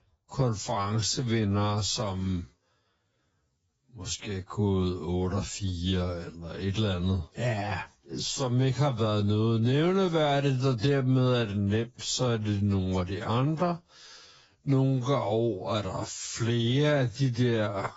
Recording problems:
garbled, watery; badly; nothing above 7.5 kHz
wrong speed, natural pitch; too slow; 0.6 times normal speed

